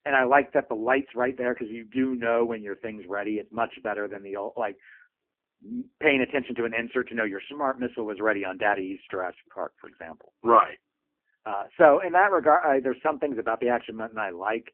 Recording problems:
phone-call audio; poor line; nothing above 3 kHz

